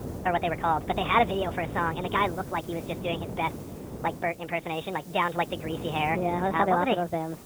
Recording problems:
high frequencies cut off; severe; nothing above 4 kHz
wrong speed and pitch; too fast and too high; 1.5 times normal speed
garbled, watery; slightly
wind noise on the microphone; occasional gusts; 15 dB below the speech
hiss; faint; throughout; 25 dB below the speech

